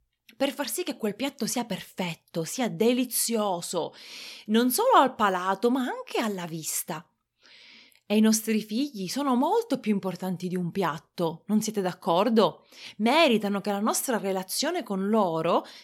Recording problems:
none

